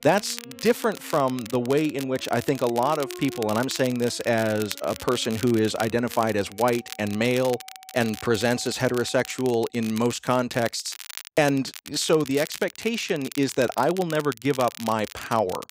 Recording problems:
crackle, like an old record; noticeable; 15 dB below the speech
background music; faint; until 9.5 s; 20 dB below the speech

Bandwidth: 15.5 kHz